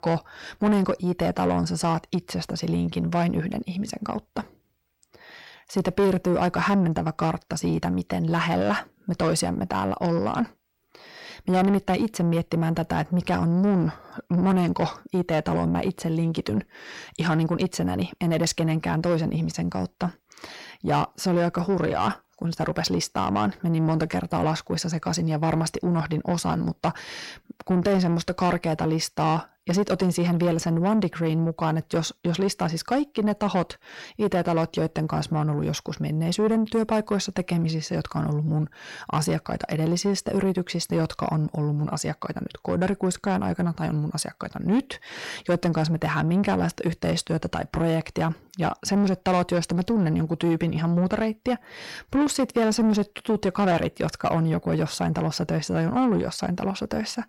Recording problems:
distortion; slight; 10 dB below the speech

